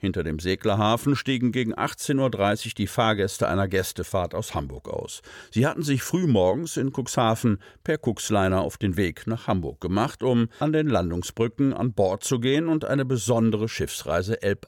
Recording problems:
none

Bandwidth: 17 kHz